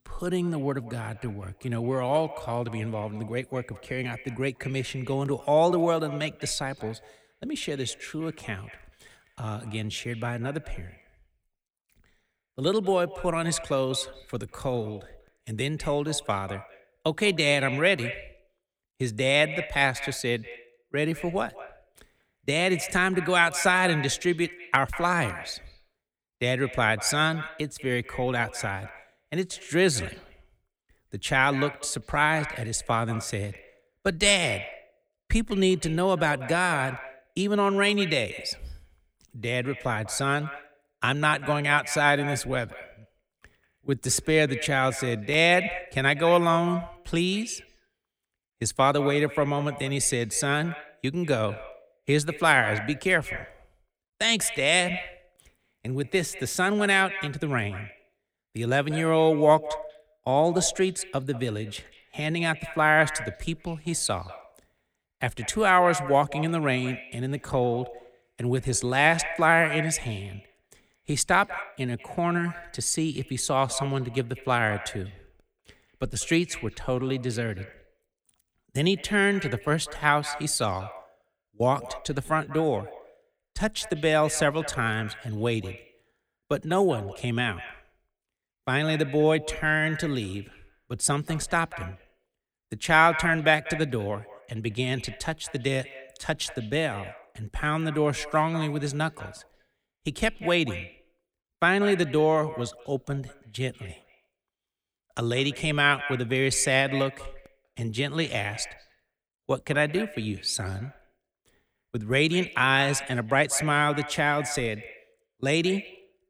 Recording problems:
echo of what is said; noticeable; throughout; 190 ms later, 15 dB below the speech

